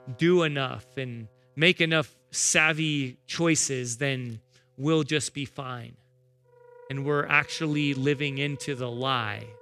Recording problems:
background music; faint; throughout; 25 dB below the speech

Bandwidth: 14.5 kHz